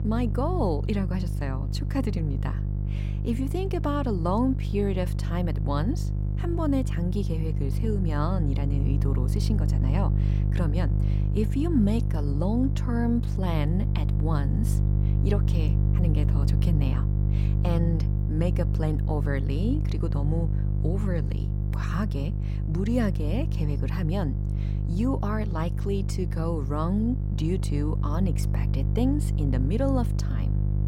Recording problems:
electrical hum; loud; throughout; 50 Hz, 7 dB below the speech

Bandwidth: 16 kHz